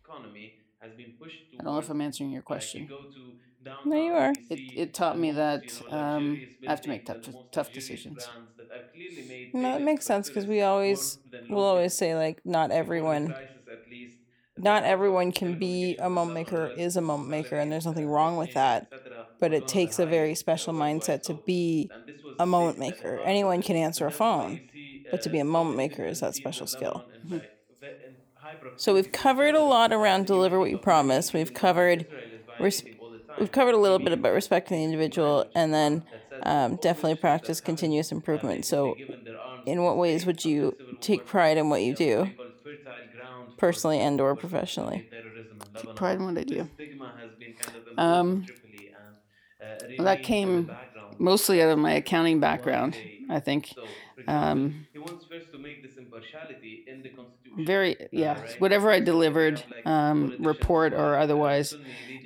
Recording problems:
voice in the background; noticeable; throughout; 20 dB below the speech

